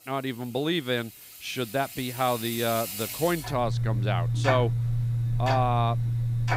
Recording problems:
household noises; loud; throughout; as loud as the speech

